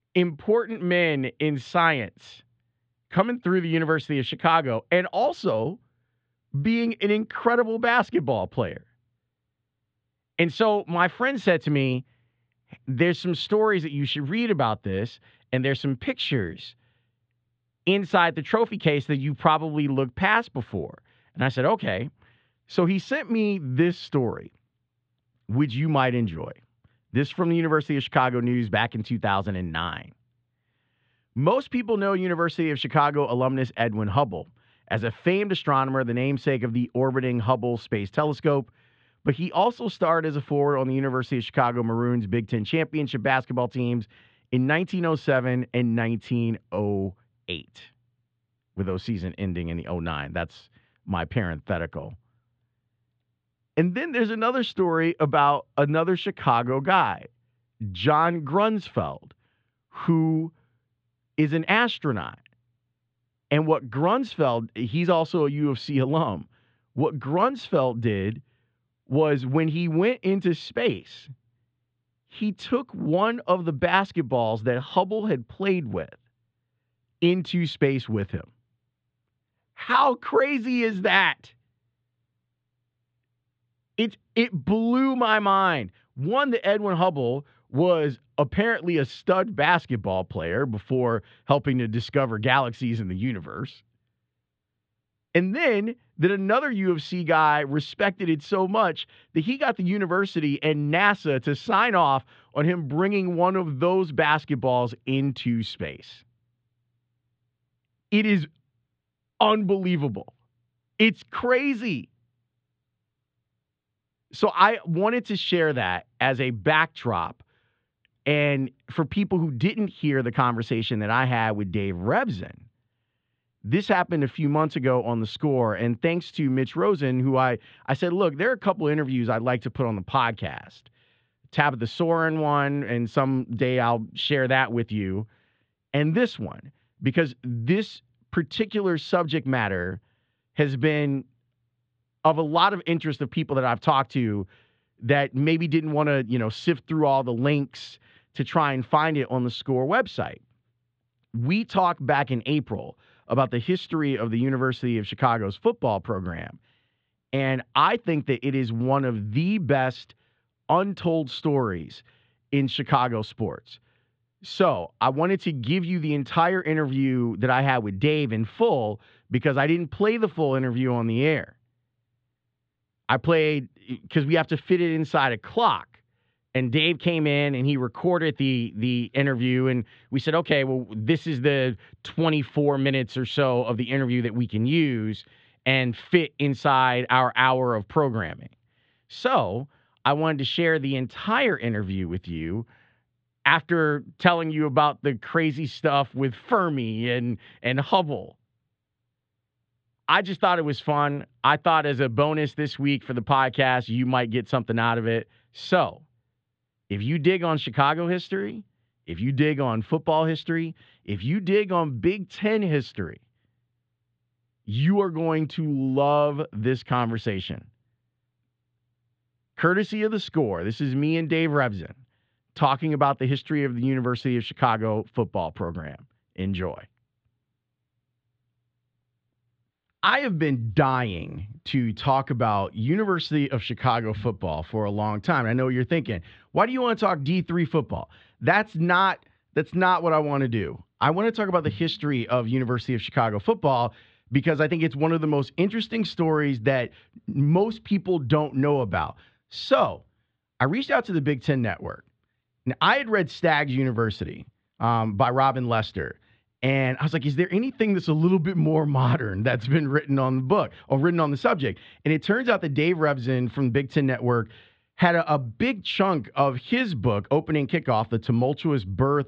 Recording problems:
muffled; very; fading above 3.5 kHz

